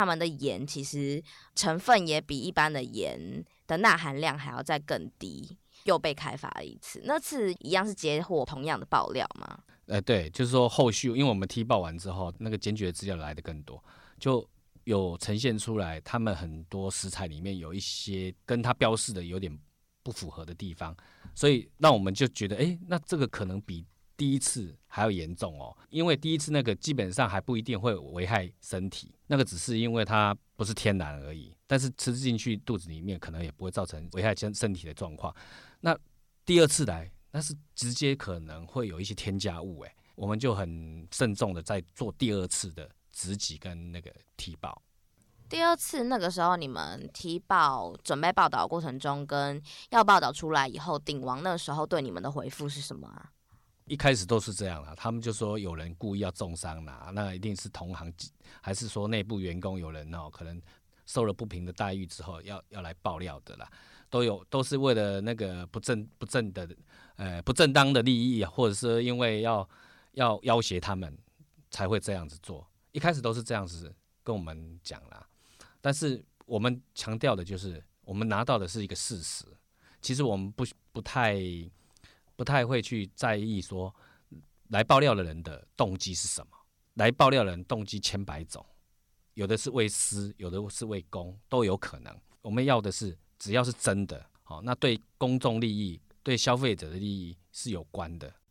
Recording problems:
abrupt cut into speech; at the start

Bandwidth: 17 kHz